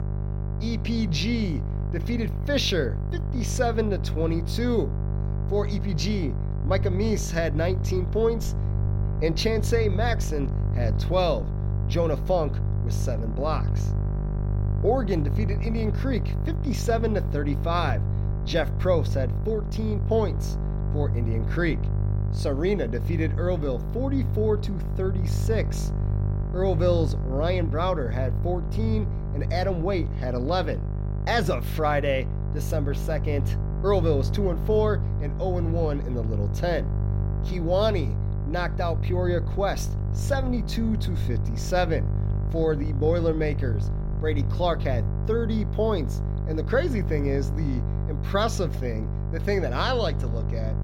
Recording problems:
electrical hum; noticeable; throughout; 50 Hz, 10 dB below the speech
low rumble; faint; from 6.5 to 16 s, from 18 to 30 s and from 33 to 45 s; 20 dB below the speech

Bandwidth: 16 kHz